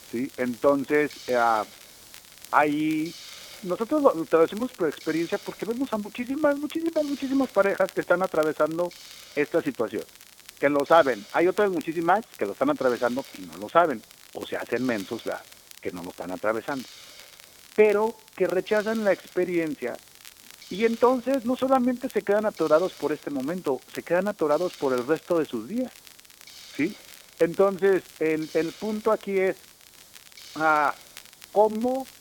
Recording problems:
phone-call audio; nothing above 3.5 kHz
hiss; faint; throughout; 20 dB below the speech
crackle, like an old record; faint; 25 dB below the speech

